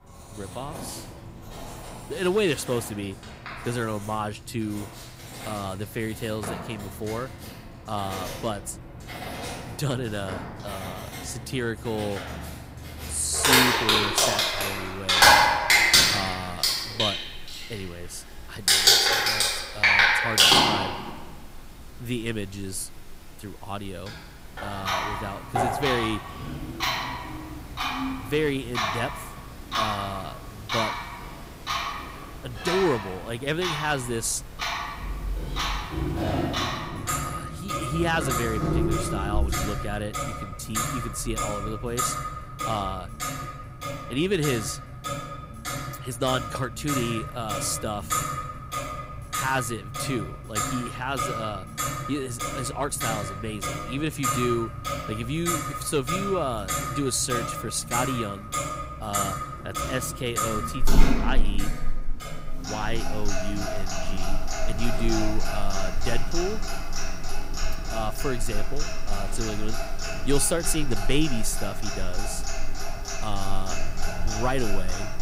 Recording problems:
household noises; very loud; throughout; 4 dB above the speech

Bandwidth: 15.5 kHz